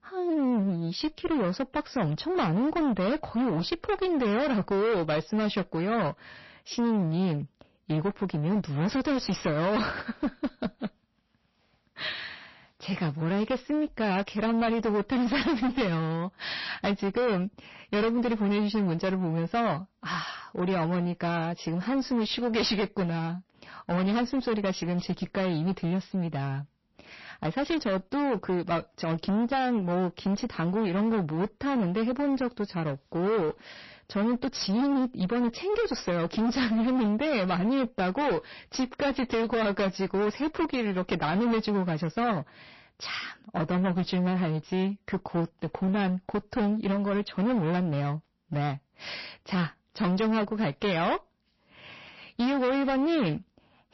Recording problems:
distortion; heavy; 23% of the sound clipped
garbled, watery; slightly; nothing above 5.5 kHz

